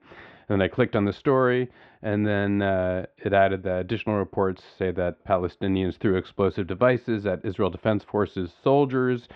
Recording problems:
muffled; very; fading above 3 kHz

